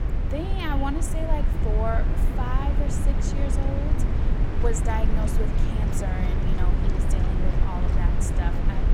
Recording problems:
echo of what is said; faint; throughout; 100 ms later, 20 dB below the speech
low rumble; loud; throughout; 2 dB below the speech
animal sounds; noticeable; throughout; 20 dB below the speech

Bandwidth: 16 kHz